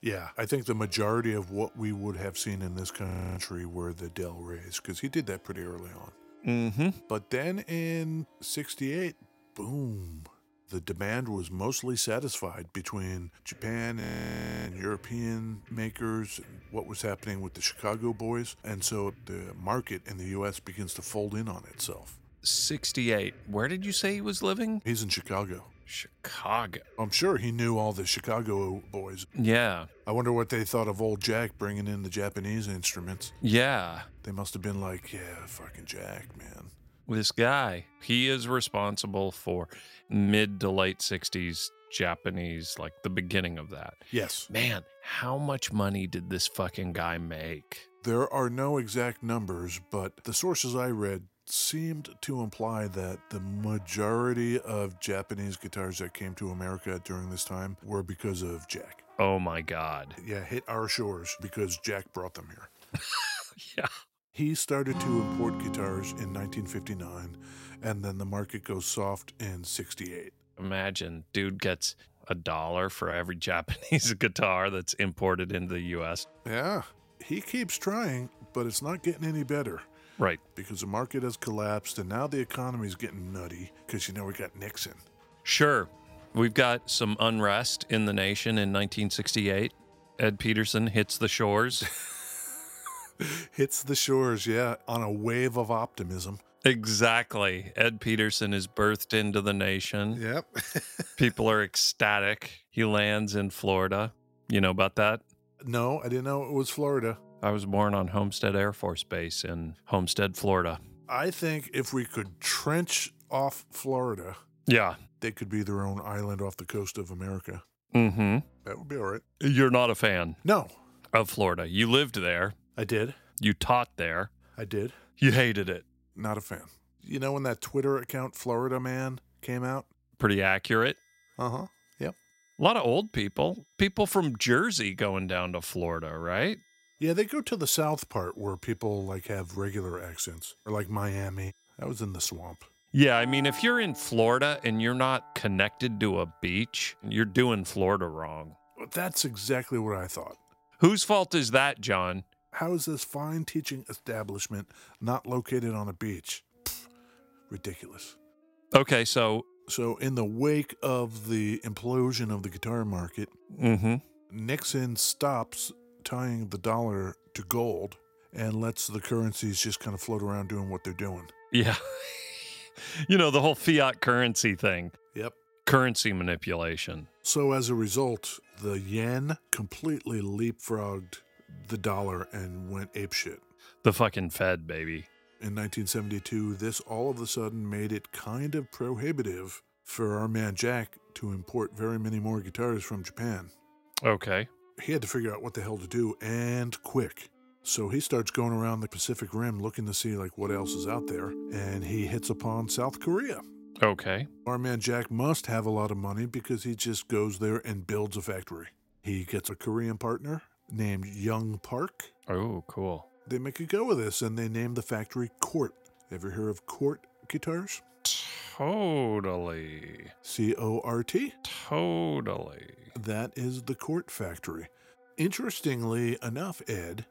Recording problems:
background music; faint; throughout; 20 dB below the speech
audio freezing; at 3 s and at 14 s for 0.5 s

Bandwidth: 16 kHz